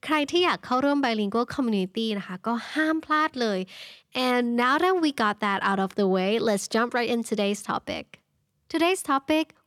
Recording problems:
none

